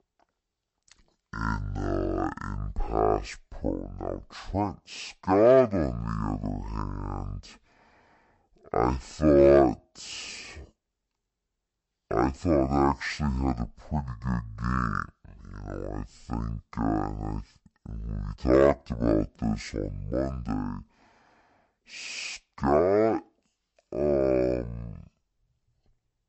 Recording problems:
wrong speed and pitch; too slow and too low; 0.5 times normal speed

